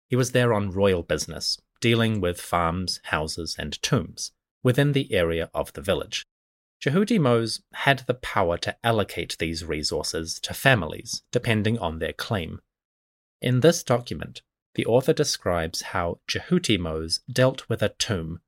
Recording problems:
none

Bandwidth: 16 kHz